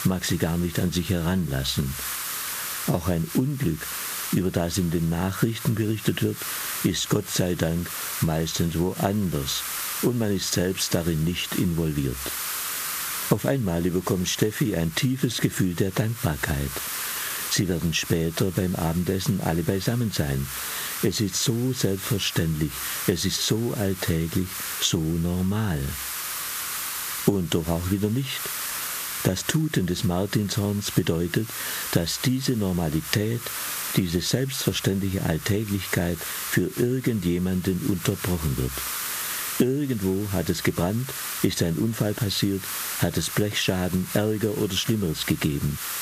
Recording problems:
squashed, flat; somewhat
hiss; loud; throughout; 7 dB below the speech

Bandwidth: 14.5 kHz